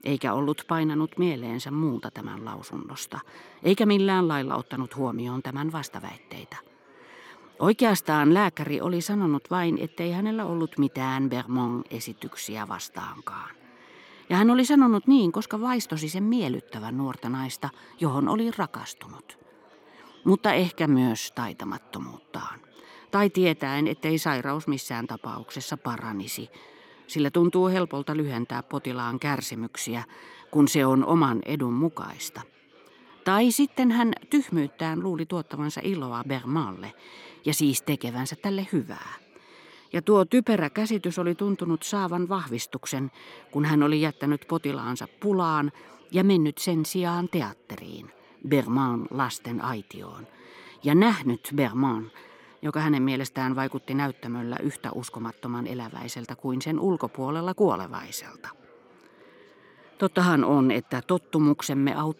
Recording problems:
chatter from many people; faint; throughout; 30 dB below the speech

